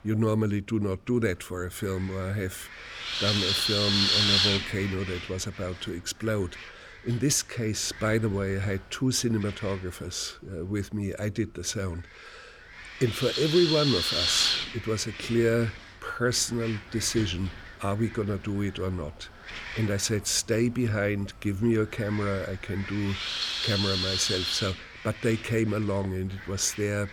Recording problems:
wind noise on the microphone; heavy; 4 dB above the speech

